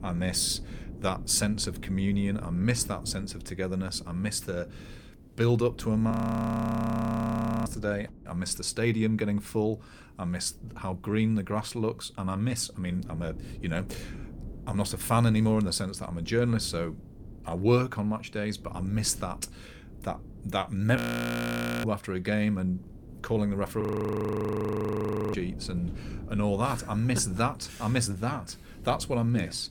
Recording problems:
wind noise on the microphone; occasional gusts; 20 dB below the speech
audio freezing; at 6 s for 1.5 s, at 21 s for 1 s and at 24 s for 1.5 s

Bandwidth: 18.5 kHz